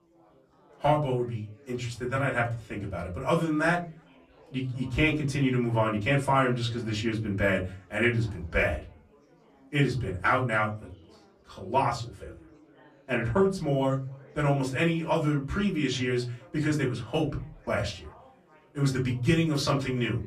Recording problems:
off-mic speech; far
room echo; very slight; dies away in 0.3 s
chatter from many people; faint; throughout; 30 dB below the speech

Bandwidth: 13.5 kHz